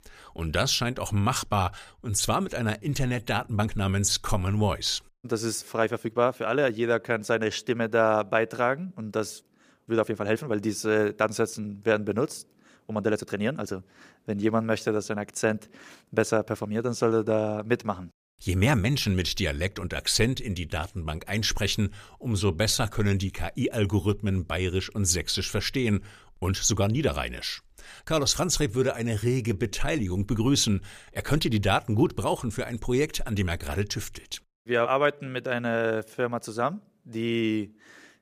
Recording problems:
uneven, jittery; strongly; from 1 to 36 s

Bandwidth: 15 kHz